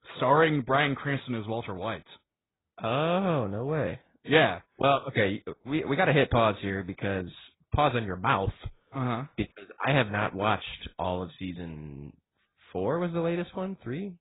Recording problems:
garbled, watery; badly; nothing above 4 kHz

